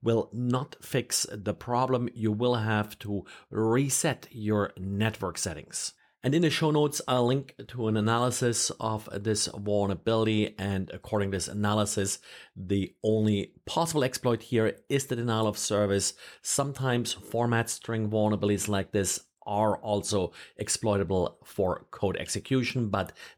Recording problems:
none

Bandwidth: 18.5 kHz